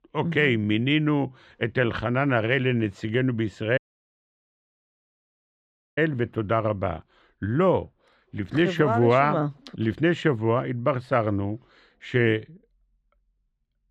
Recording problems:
muffled; slightly; fading above 3 kHz
audio cutting out; at 4 s for 2 s

